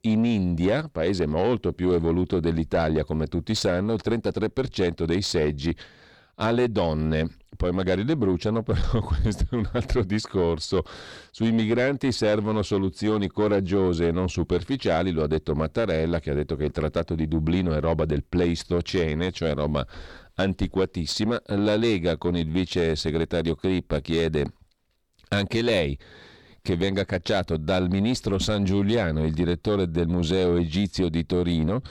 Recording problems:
distortion; slight; 9 dB below the speech

